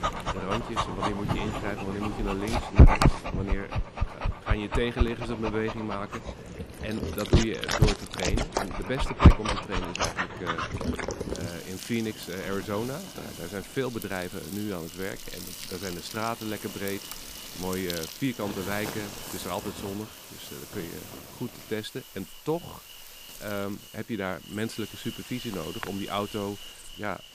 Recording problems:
animal sounds; very loud; throughout; 4 dB above the speech

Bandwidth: 15 kHz